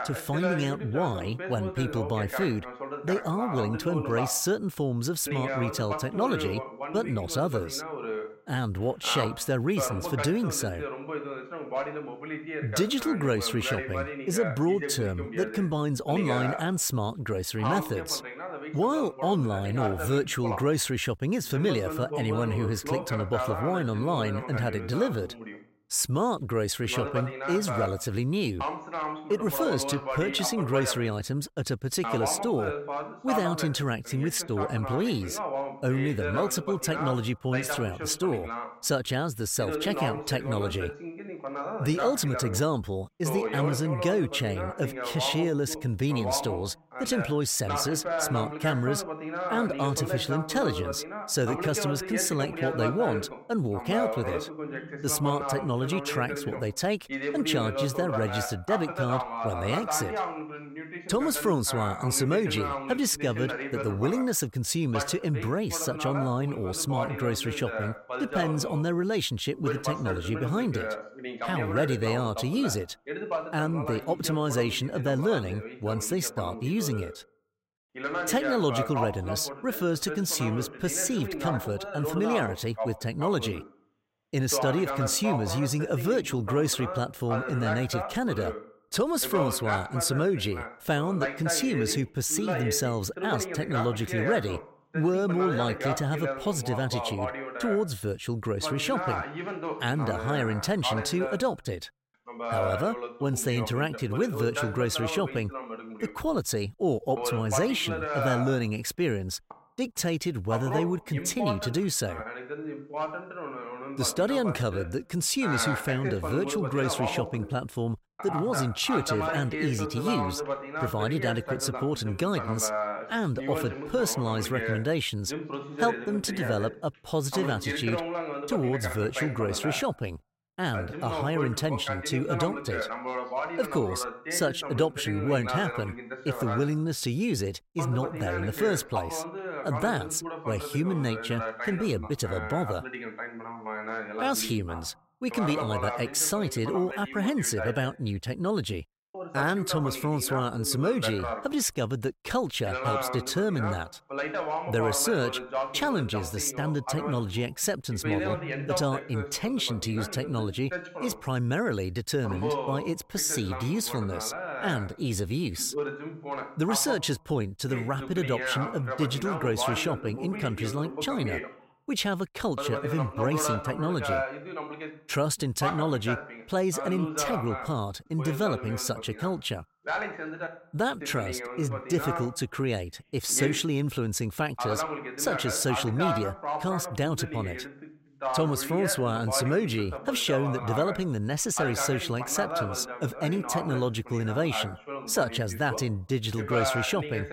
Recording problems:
voice in the background; loud; throughout; 6 dB below the speech

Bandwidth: 16 kHz